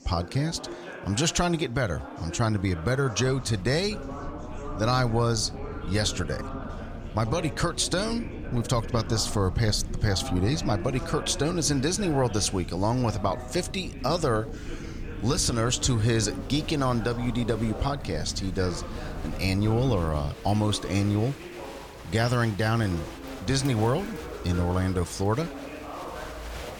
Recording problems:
murmuring crowd; noticeable; throughout; 15 dB below the speech
low rumble; faint; from 3 to 20 s; 20 dB below the speech

